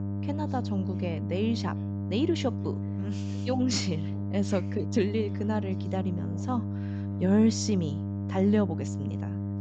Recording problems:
high frequencies cut off; noticeable; nothing above 8 kHz
electrical hum; loud; throughout; 50 Hz, 8 dB below the speech
voice in the background; faint; throughout; 30 dB below the speech

